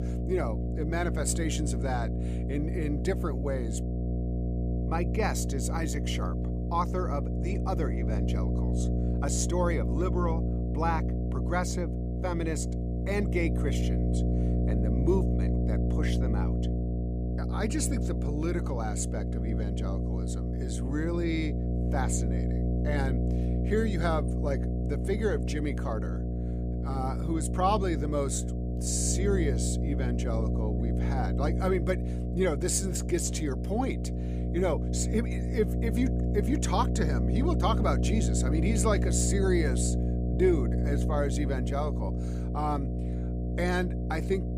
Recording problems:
electrical hum; loud; throughout; 60 Hz, 6 dB below the speech

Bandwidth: 15 kHz